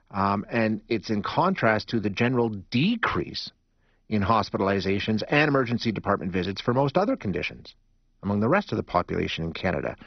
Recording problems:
garbled, watery; badly; nothing above 5.5 kHz

